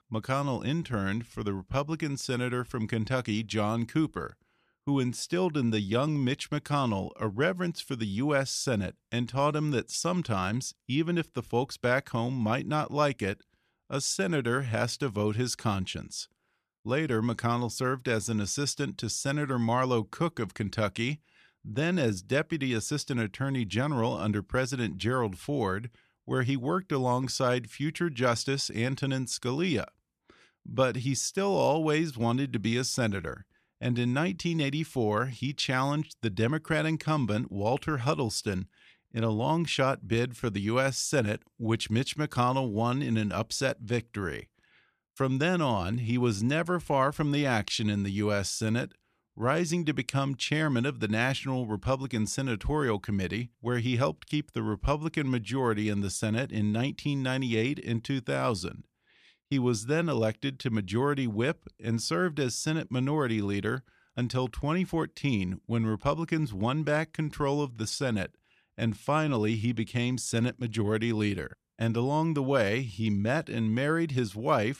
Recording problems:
none

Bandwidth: 14 kHz